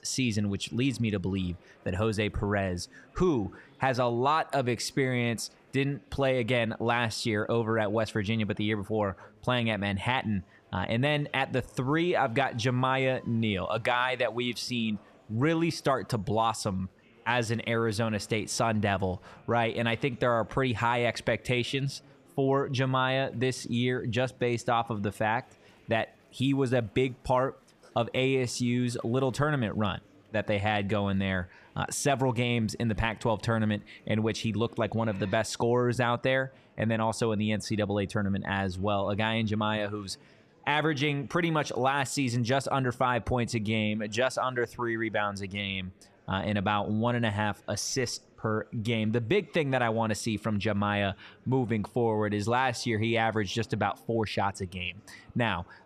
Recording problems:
murmuring crowd; faint; throughout; 30 dB below the speech

